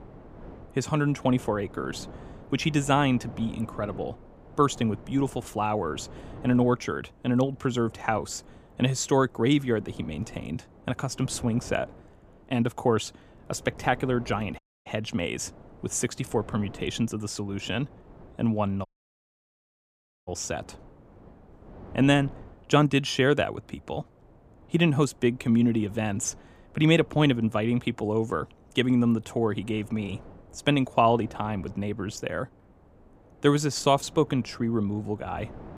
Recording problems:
wind noise on the microphone; occasional gusts; 25 dB below the speech
audio cutting out; at 15 s and at 19 s for 1.5 s

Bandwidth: 15 kHz